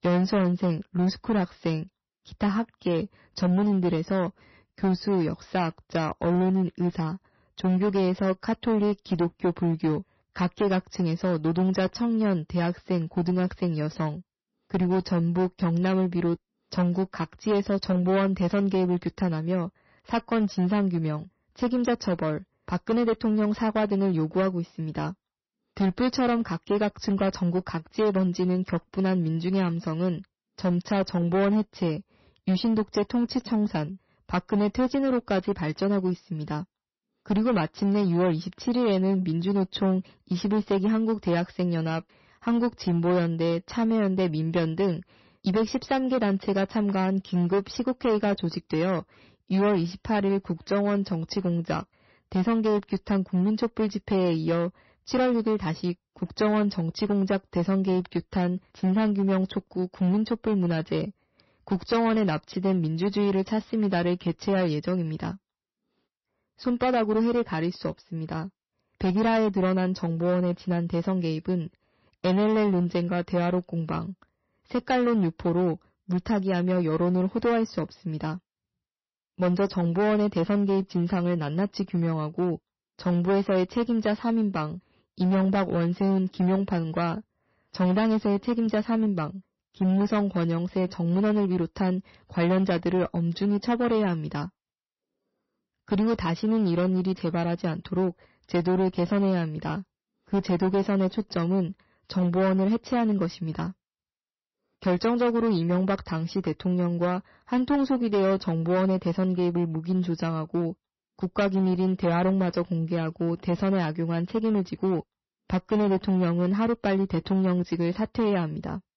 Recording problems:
distortion; slight; 10% of the sound clipped
garbled, watery; slightly; nothing above 6 kHz

